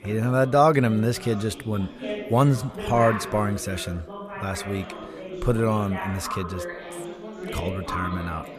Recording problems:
background chatter; noticeable; throughout; 3 voices, 10 dB below the speech

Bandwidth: 14.5 kHz